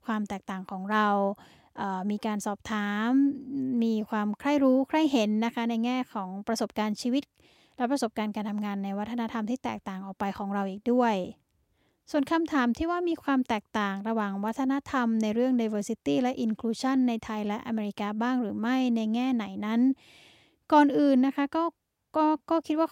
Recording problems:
none

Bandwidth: 16 kHz